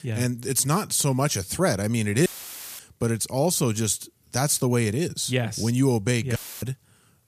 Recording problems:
audio cutting out; filled with static; at 2.5 s for 0.5 s and at 6.5 s

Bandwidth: 14.5 kHz